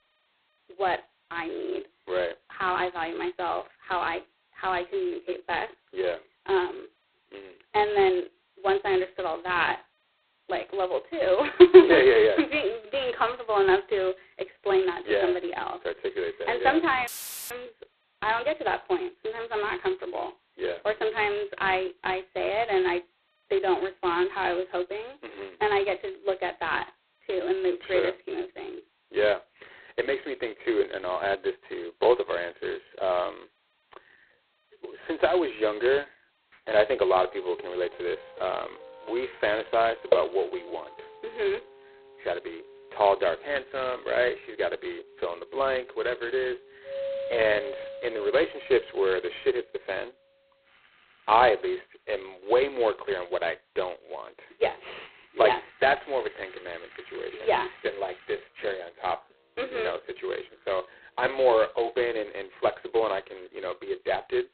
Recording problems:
phone-call audio; poor line; nothing above 4 kHz
muffled; very slightly; fading above 1.5 kHz
background music; noticeable; from 37 s on; 20 dB below the speech
audio cutting out; filled with static; at 17 s

